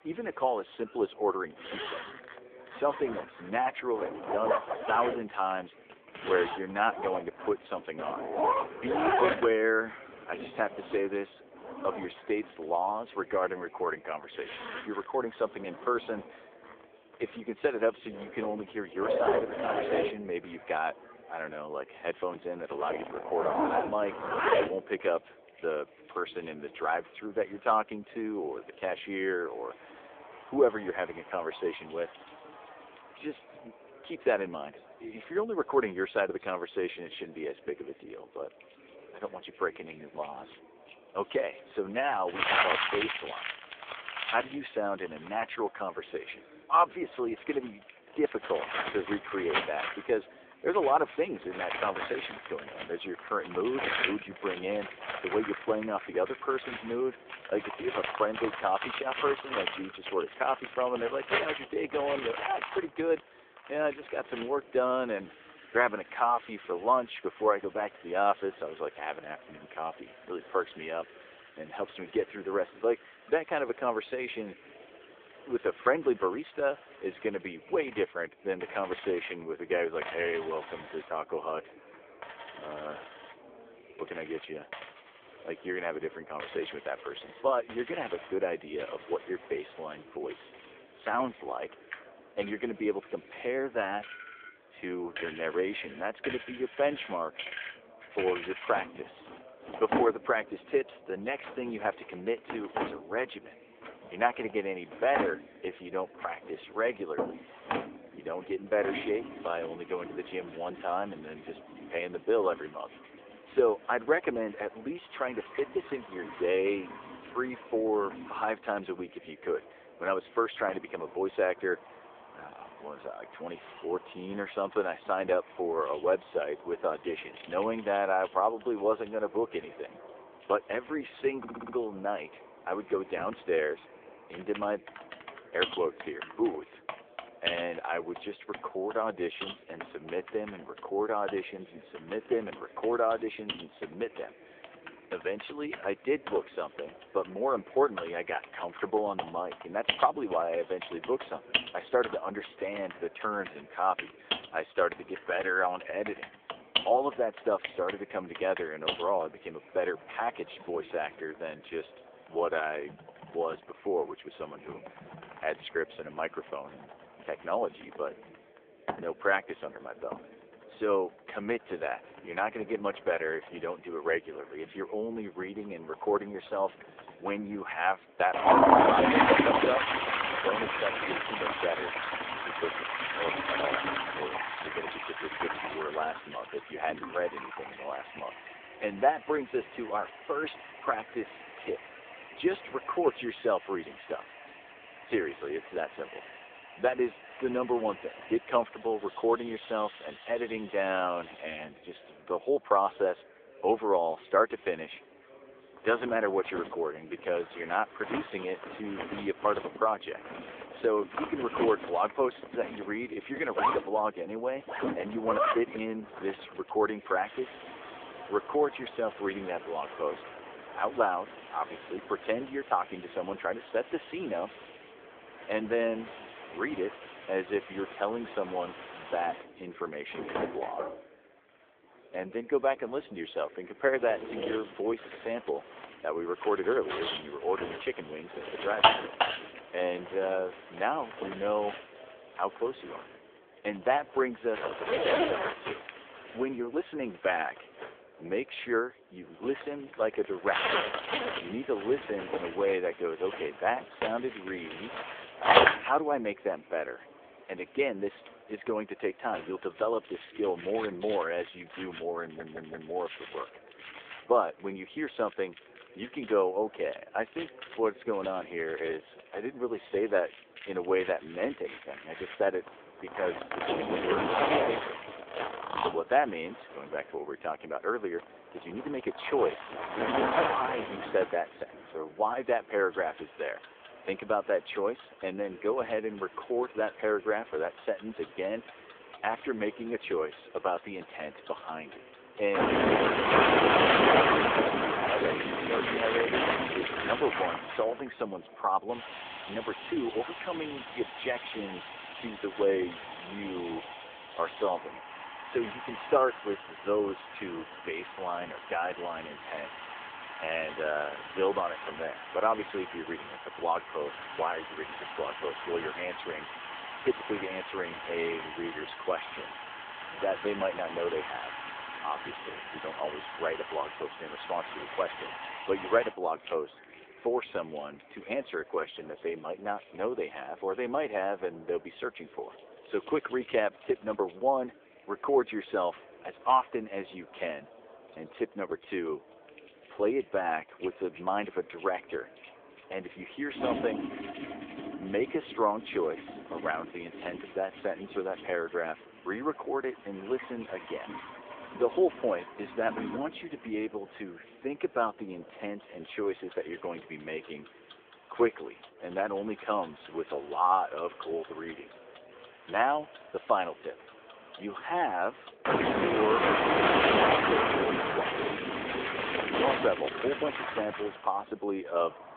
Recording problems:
phone-call audio
household noises; loud; throughout; 1 dB below the speech
murmuring crowd; faint; throughout; 20 dB below the speech
audio stuttering; at 2:11 and at 4:22

